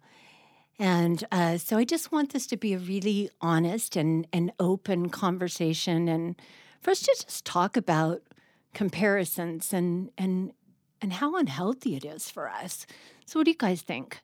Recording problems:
none

